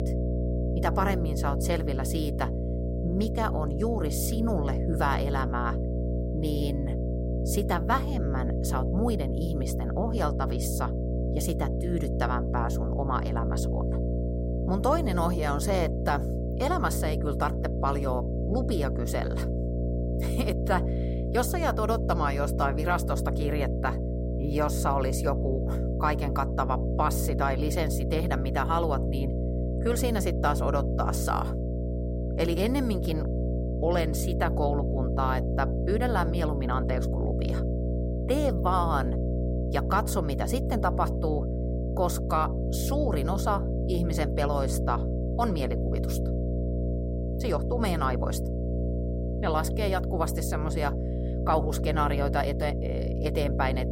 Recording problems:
electrical hum; loud; throughout; 60 Hz, 6 dB below the speech

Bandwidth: 16 kHz